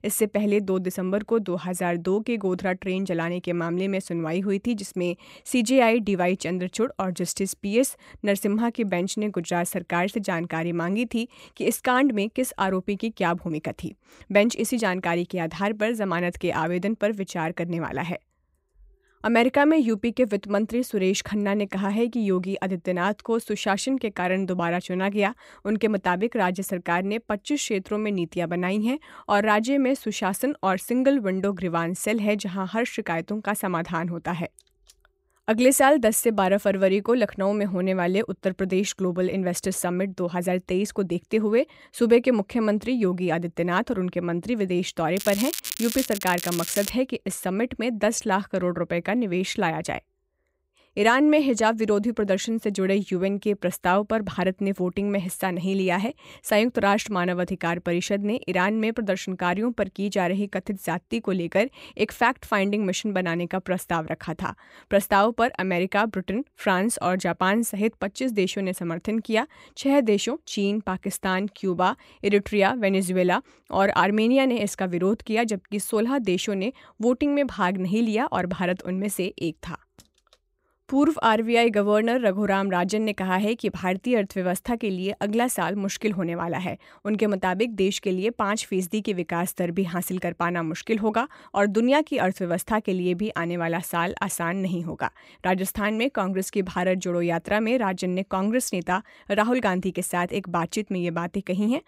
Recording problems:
crackling; loud; from 45 to 47 s; 6 dB below the speech

